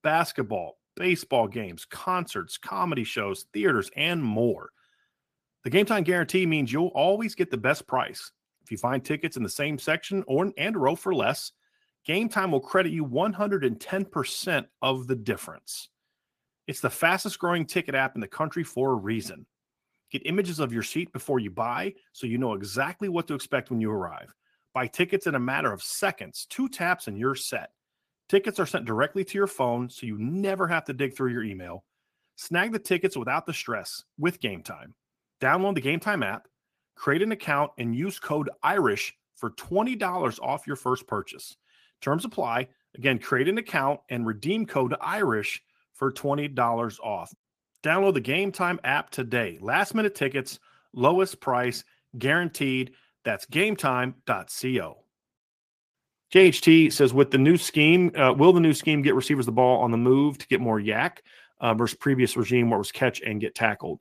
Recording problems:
garbled, watery; slightly; nothing above 14.5 kHz

